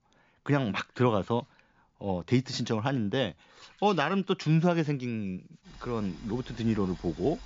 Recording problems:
high frequencies cut off; noticeable; nothing above 7.5 kHz
household noises; faint; throughout; 25 dB below the speech

